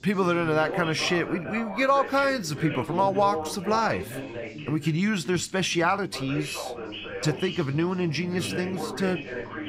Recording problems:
background chatter; loud; throughout; 3 voices, 9 dB below the speech

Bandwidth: 15.5 kHz